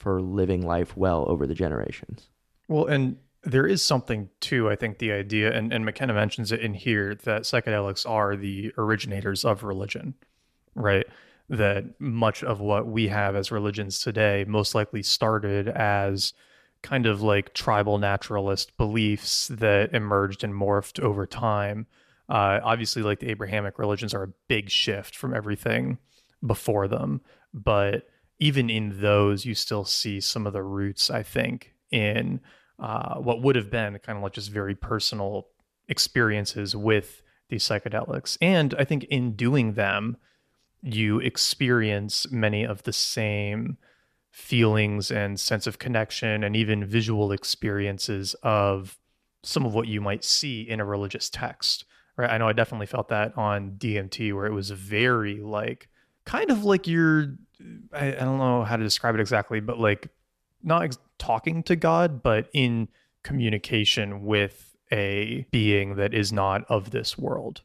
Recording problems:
none

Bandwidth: 14.5 kHz